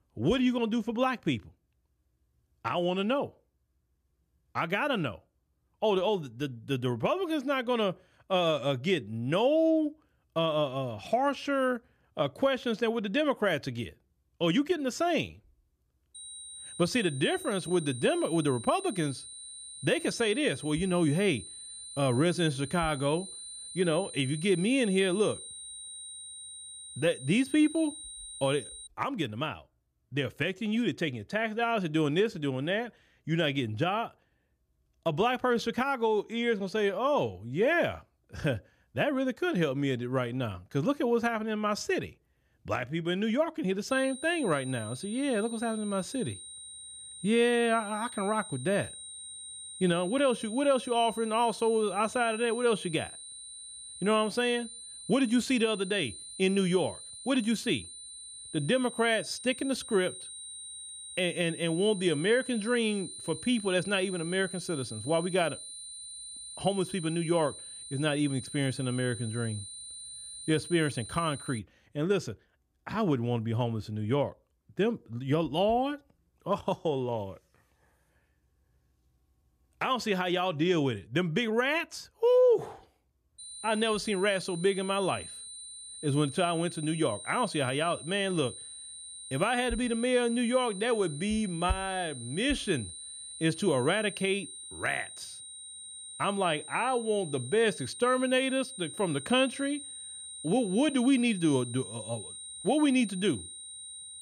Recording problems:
high-pitched whine; noticeable; from 16 to 29 s, from 44 s to 1:12 and from 1:23 on; 8.5 kHz, 10 dB below the speech

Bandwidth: 14.5 kHz